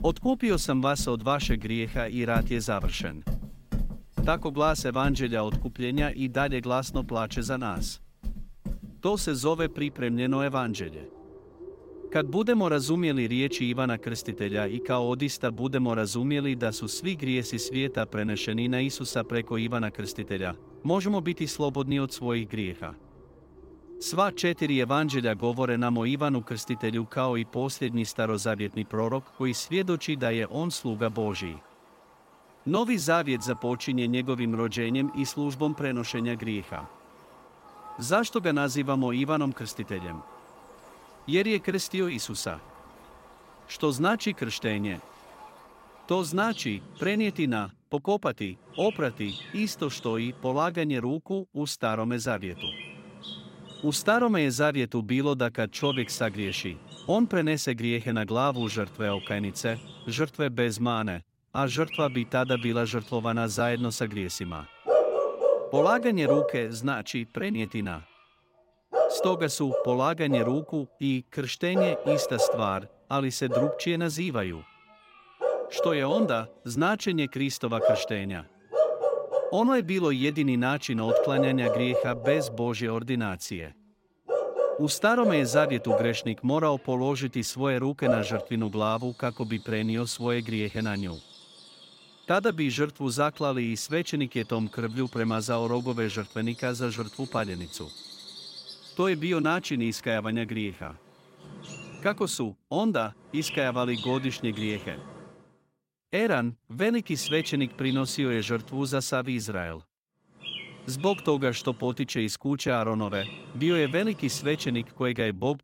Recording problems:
animal sounds; loud; throughout; 5 dB below the speech

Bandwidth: 16 kHz